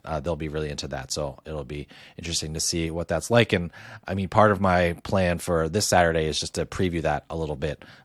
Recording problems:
none

